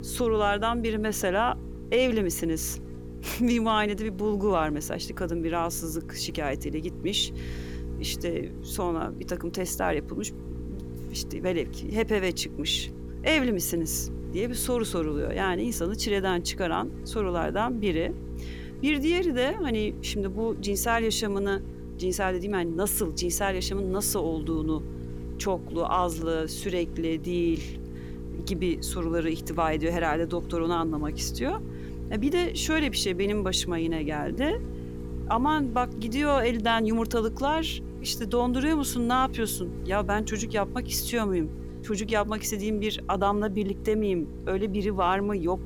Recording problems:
electrical hum; noticeable; throughout; 60 Hz, 15 dB below the speech

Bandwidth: 18.5 kHz